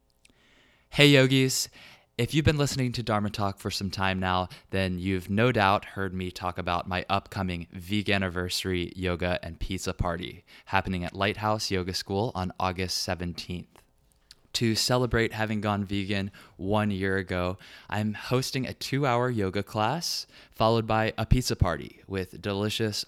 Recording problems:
none

